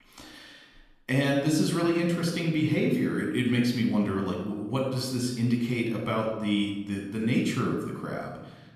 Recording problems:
room echo; noticeable; dies away in 0.9 s
off-mic speech; somewhat distant

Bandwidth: 14.5 kHz